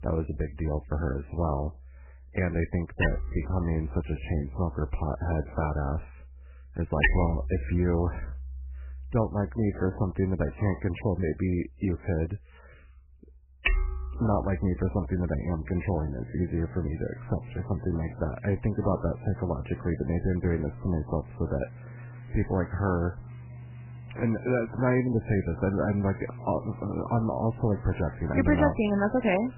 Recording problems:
garbled, watery; badly; nothing above 2.5 kHz
machinery noise; loud; throughout; 10 dB below the speech

